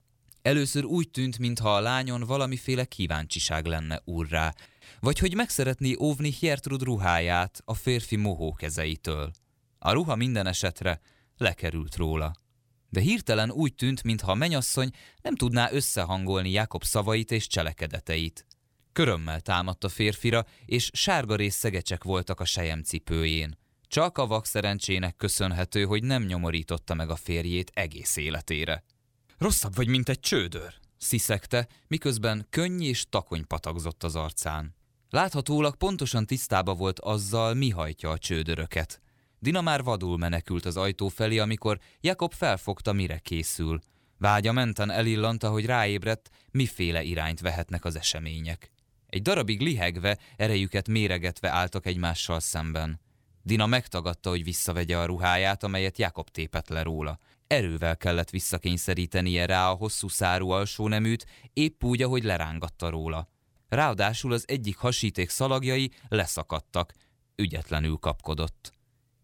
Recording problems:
none

